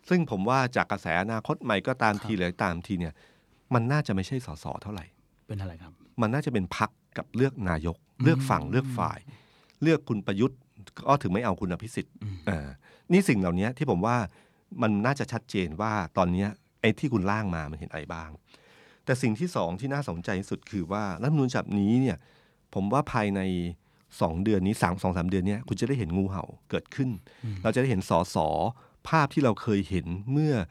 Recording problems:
none

